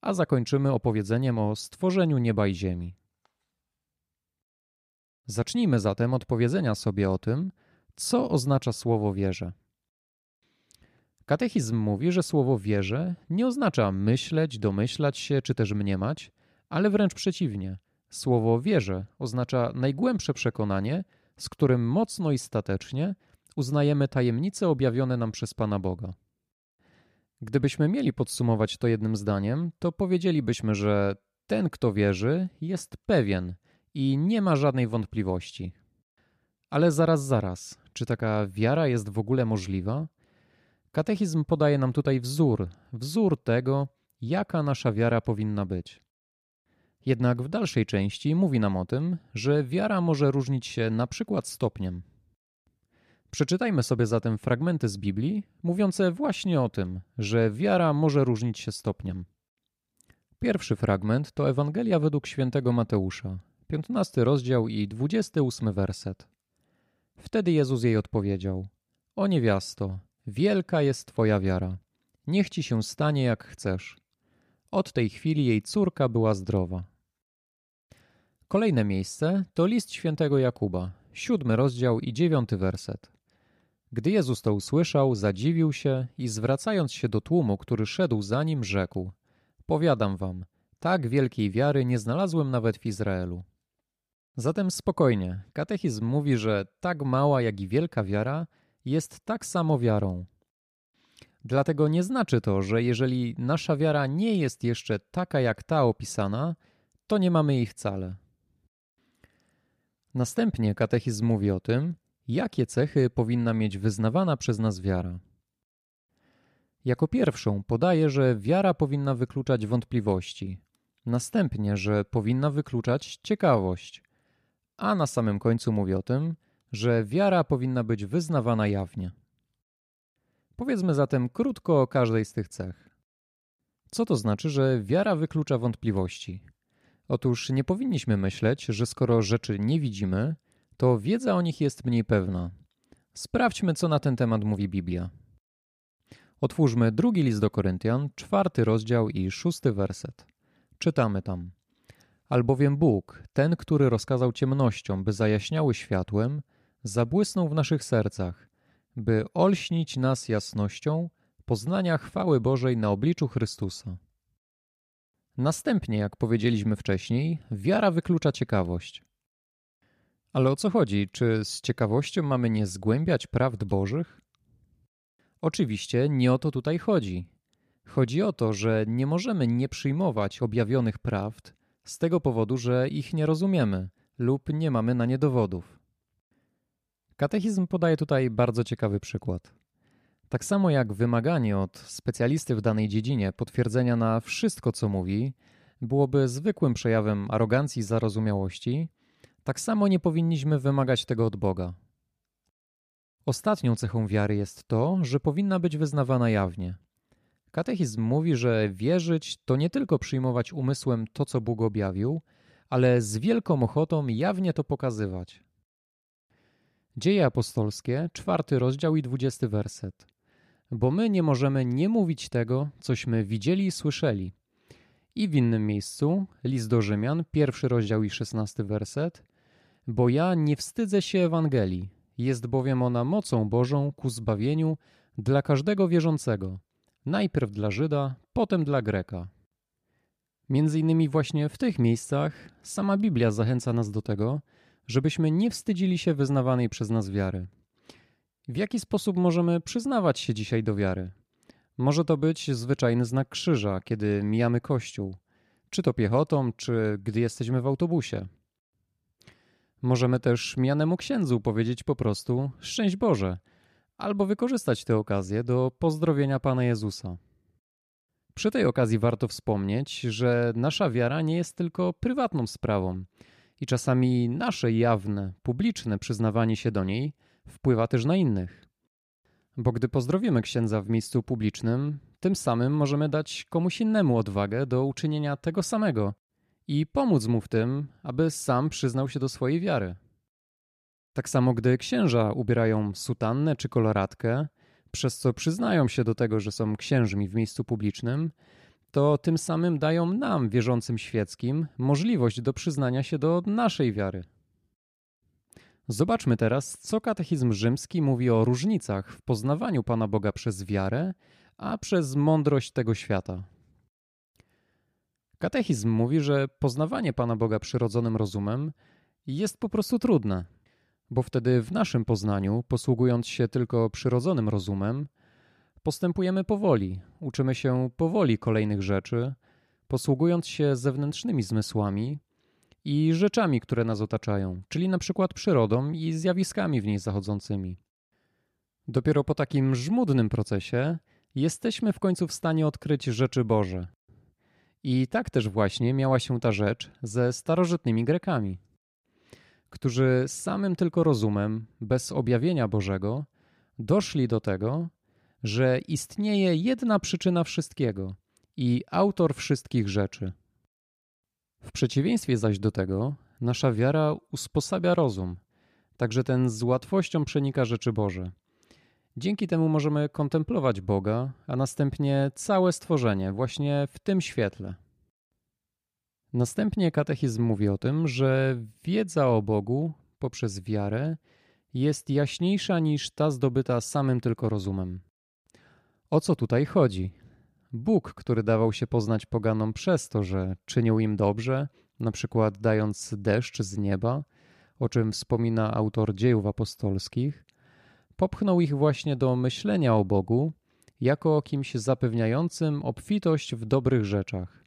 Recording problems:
none

